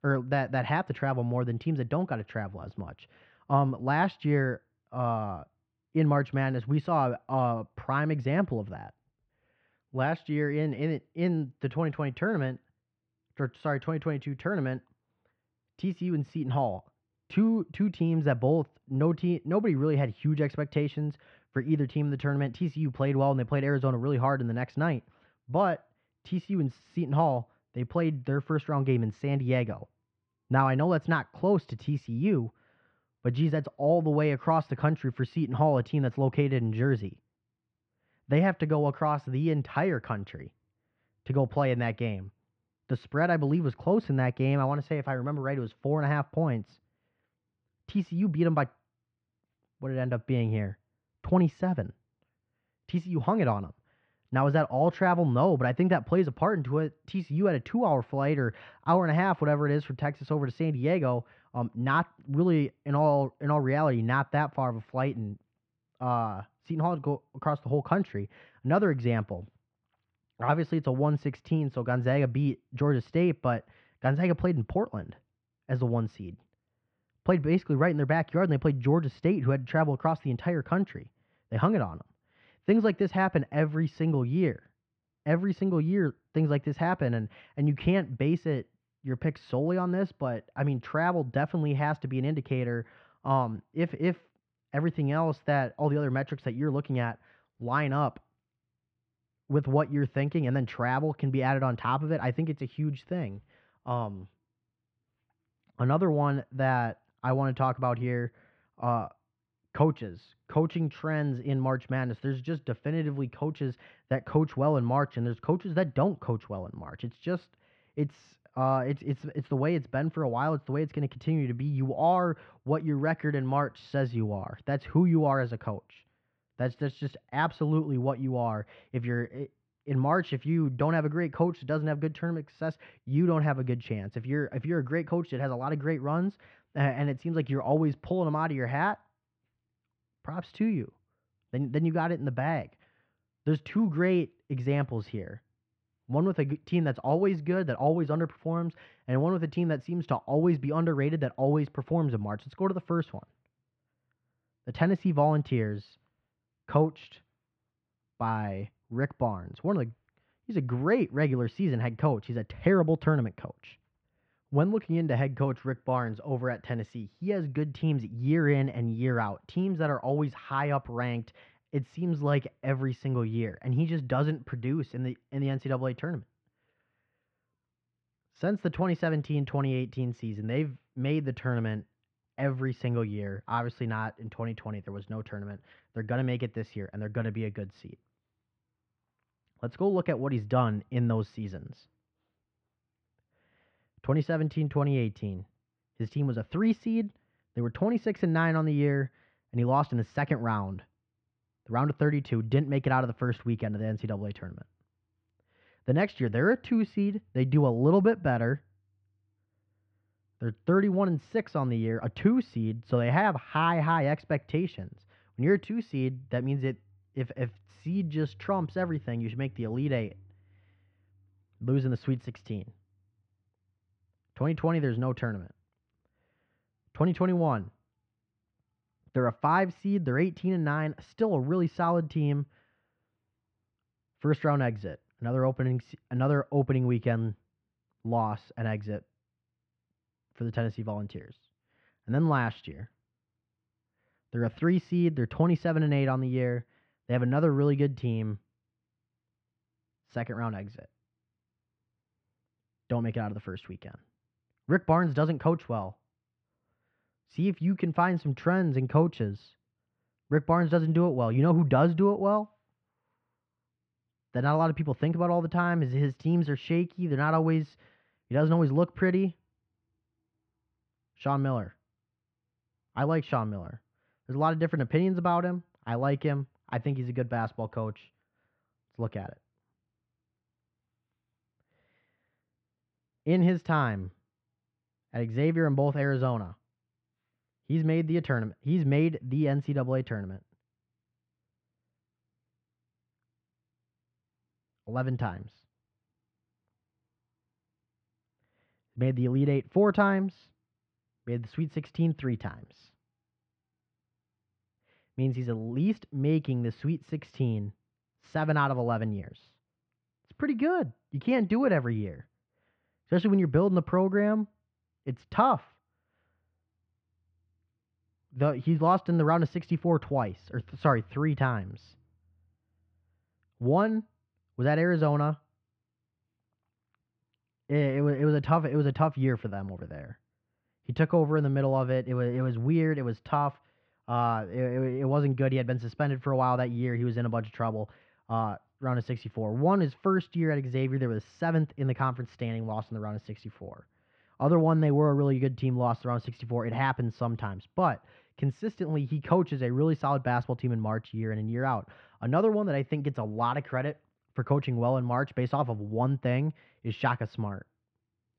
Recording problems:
muffled; very; fading above 3 kHz

